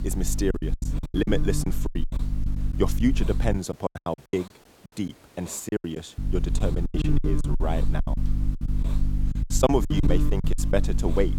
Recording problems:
electrical hum; loud; until 3.5 s and from 6 s on; 50 Hz, 9 dB below the speech
hiss; faint; throughout; 20 dB below the speech
choppy; very; 18% of the speech affected

